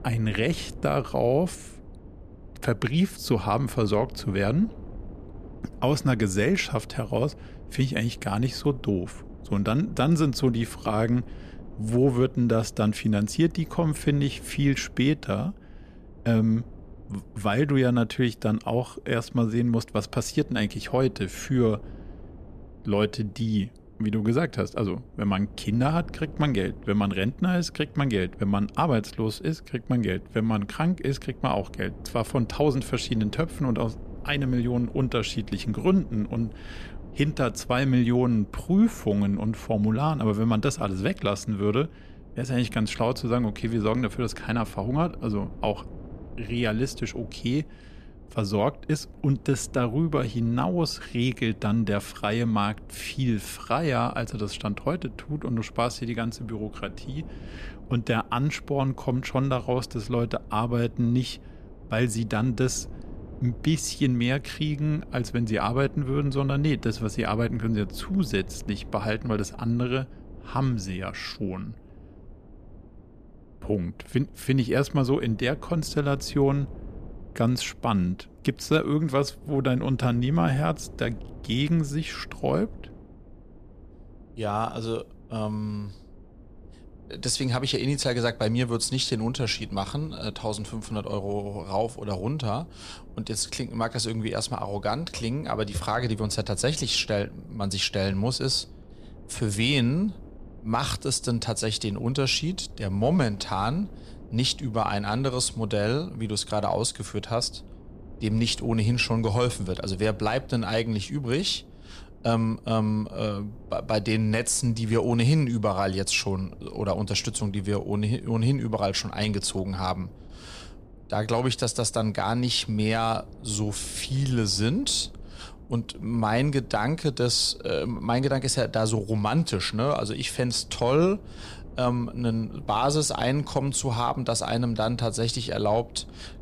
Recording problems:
wind noise on the microphone; occasional gusts; 25 dB below the speech

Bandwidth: 14.5 kHz